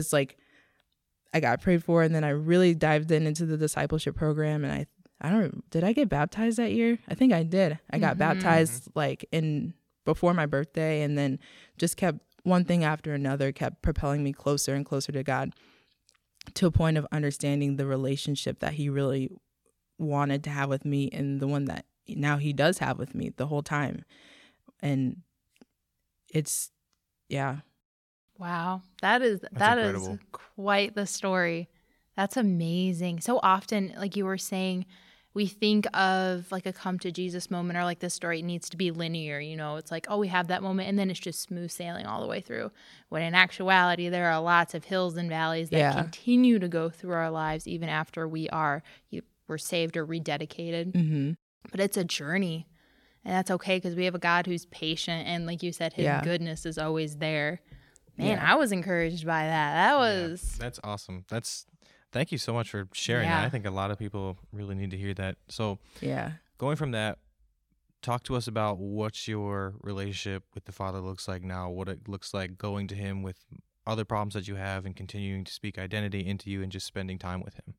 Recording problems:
abrupt cut into speech; at the start

